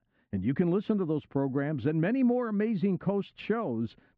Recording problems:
muffled; very; fading above 1.5 kHz

